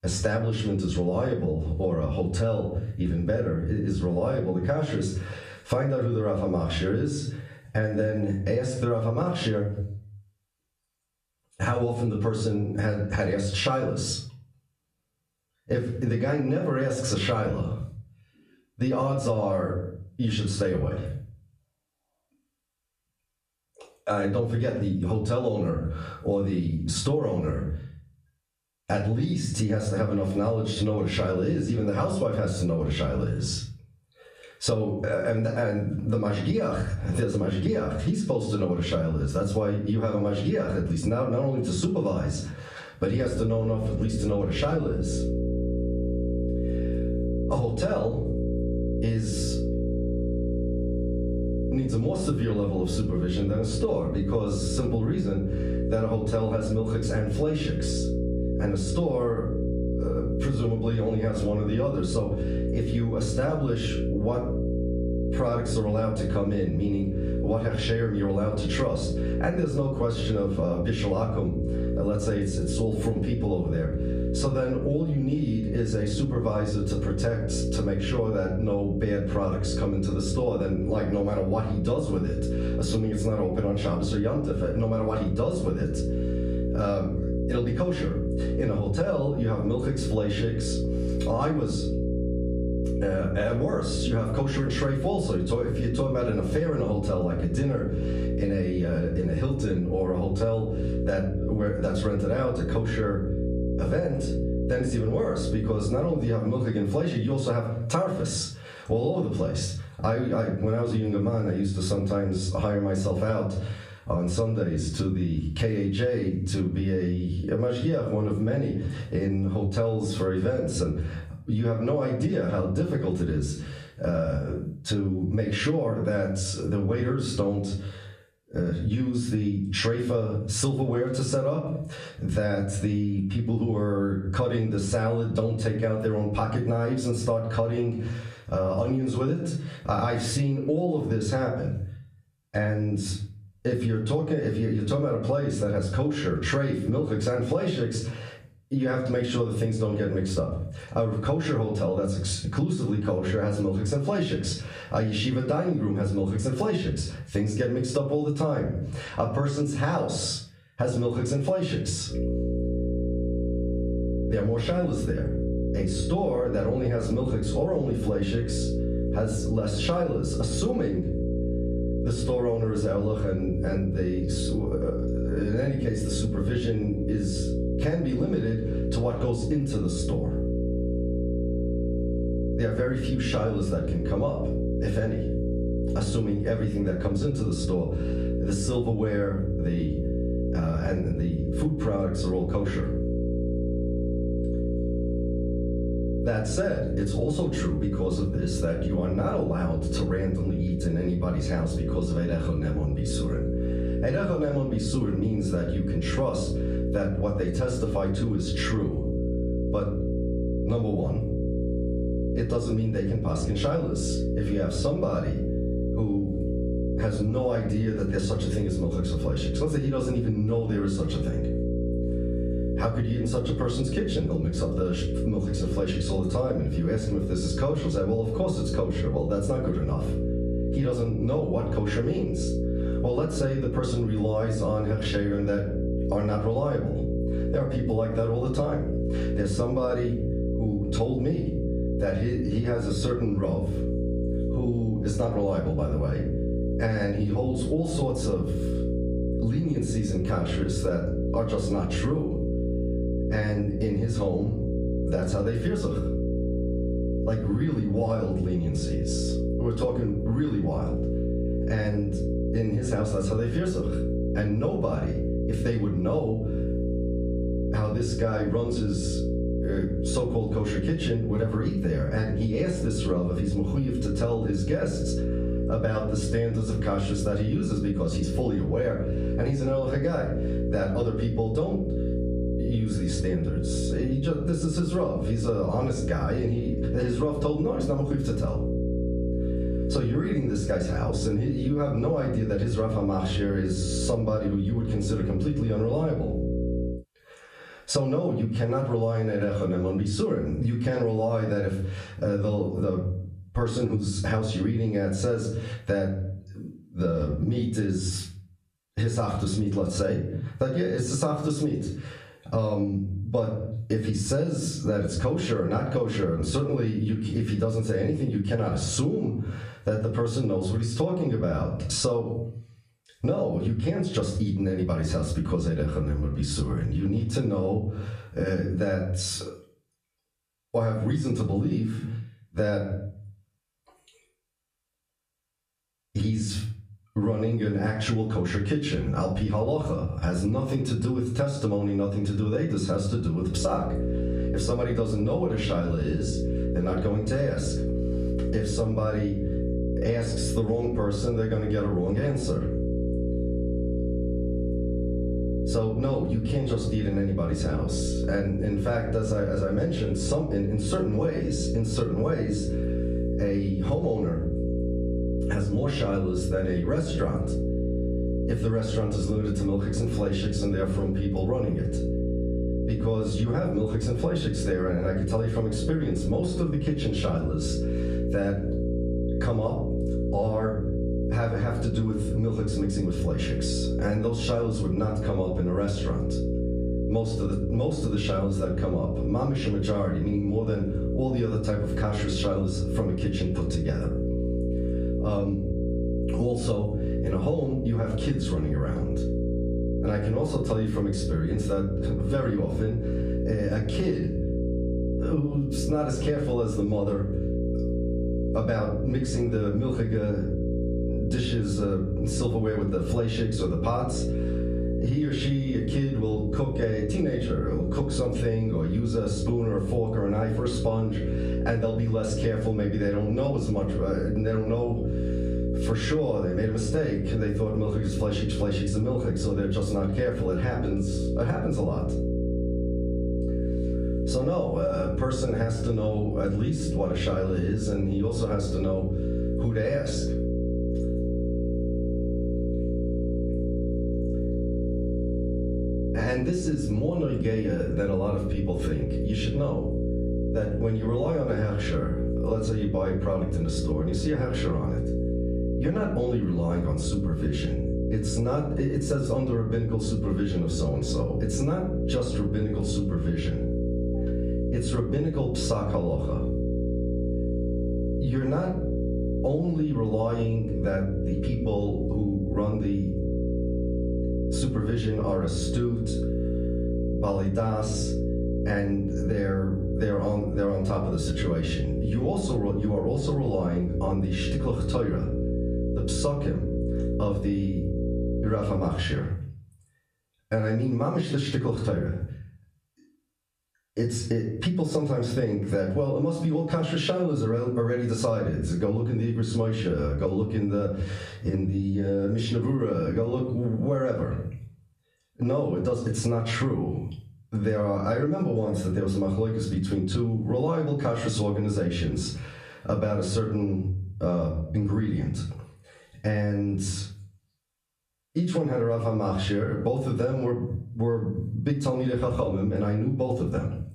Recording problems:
off-mic speech; far
room echo; slight; dies away in 0.4 s
squashed, flat; somewhat
electrical hum; loud; from 43 s to 1:46, from 2:42 to 4:57 and from 5:44 to 8:09; 60 Hz, 6 dB below the speech

